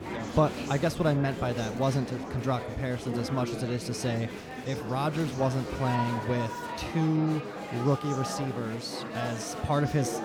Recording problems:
chatter from many people; loud; throughout; 6 dB below the speech

